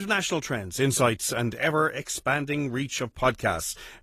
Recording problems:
garbled, watery; slightly; nothing above 15 kHz
abrupt cut into speech; at the start

